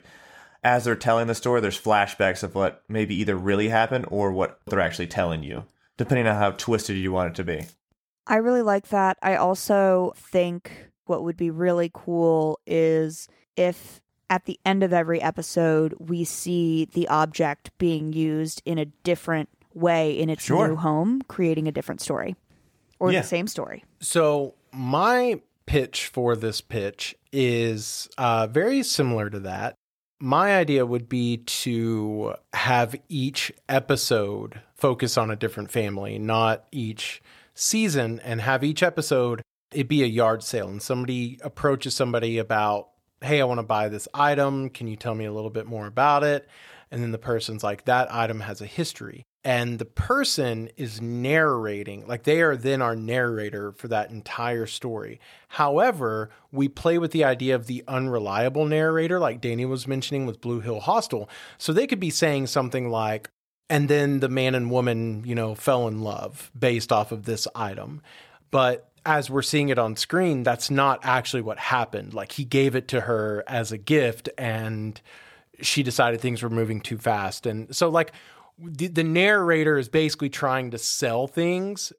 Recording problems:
none

